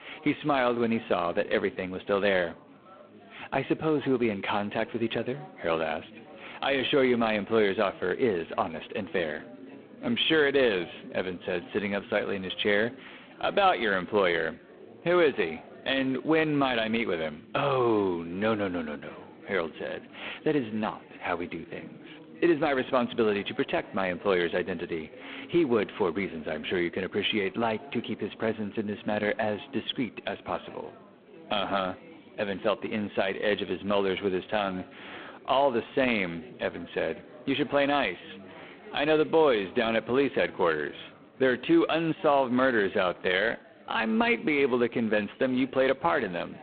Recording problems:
phone-call audio; poor line
chatter from many people; faint; throughout; 20 dB below the speech

